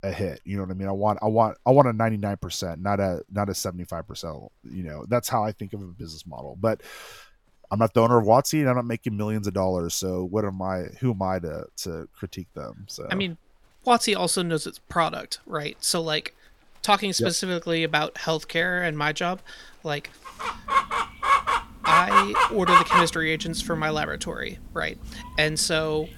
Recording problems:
animal sounds; very loud; throughout; 3 dB above the speech

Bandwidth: 17 kHz